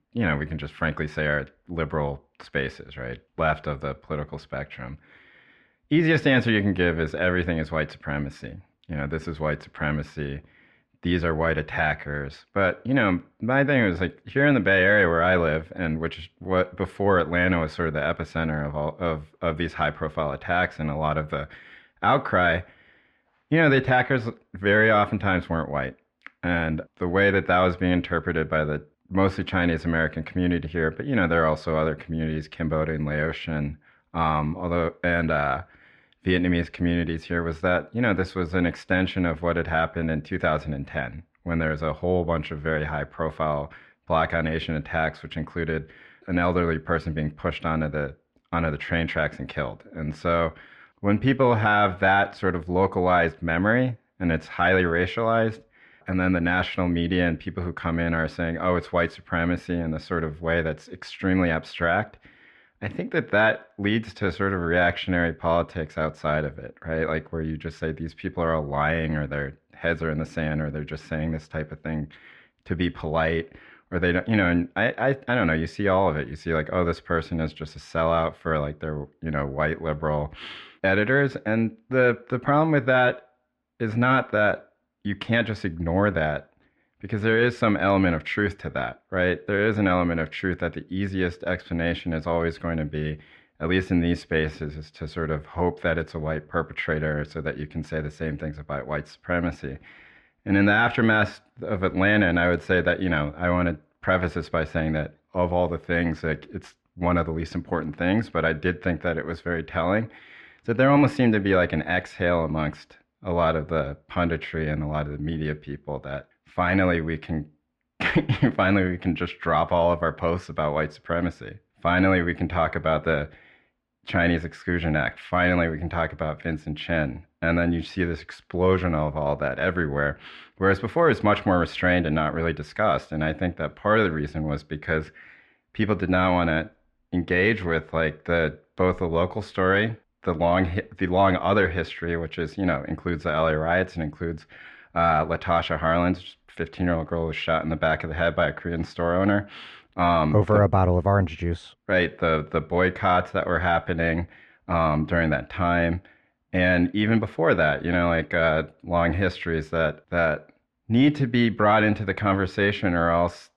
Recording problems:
muffled; slightly; fading above 2.5 kHz

